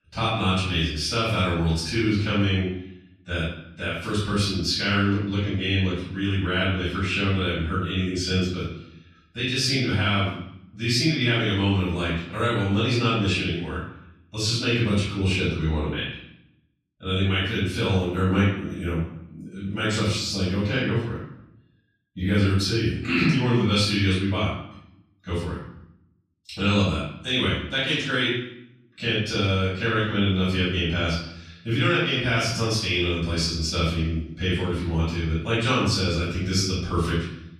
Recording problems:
off-mic speech; far
room echo; noticeable; dies away in 0.7 s

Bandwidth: 13.5 kHz